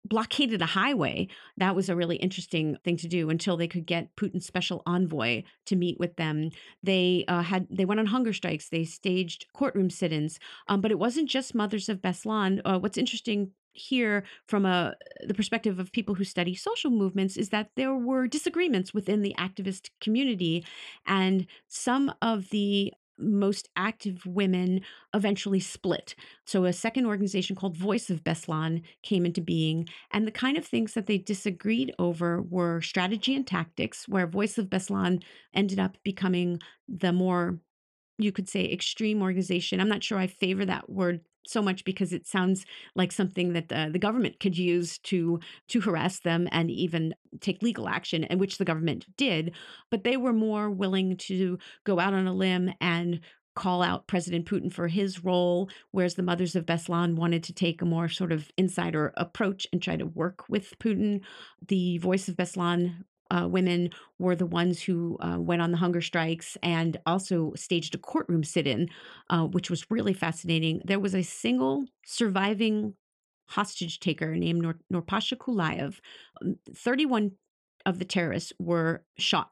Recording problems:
none

